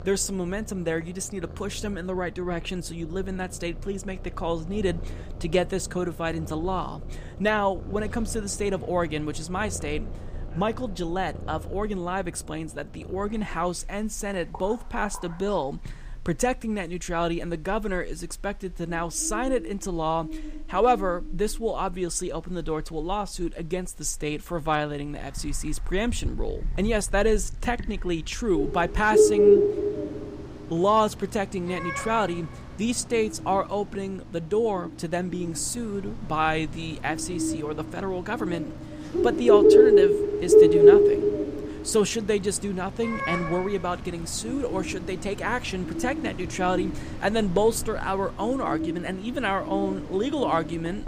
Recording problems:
animal sounds; very loud; throughout; 4 dB above the speech

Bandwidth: 15 kHz